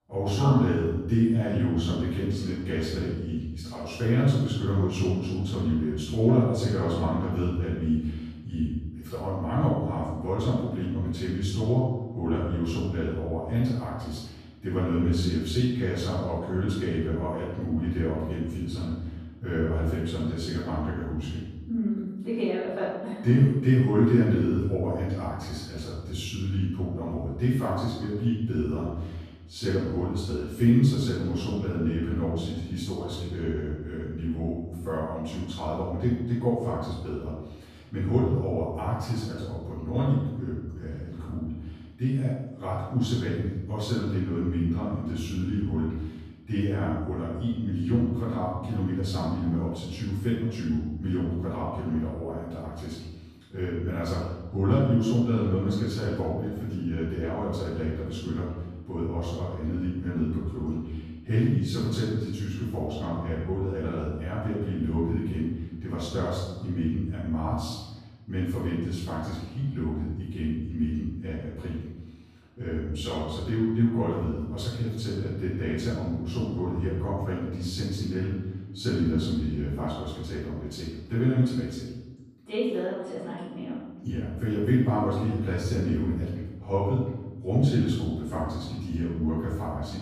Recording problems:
room echo; strong; dies away in 1 s
off-mic speech; far

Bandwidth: 14.5 kHz